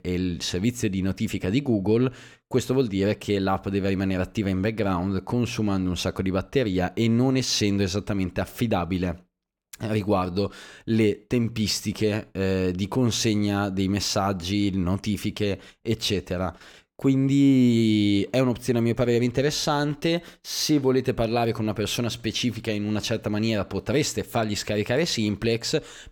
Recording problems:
none

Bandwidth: 18.5 kHz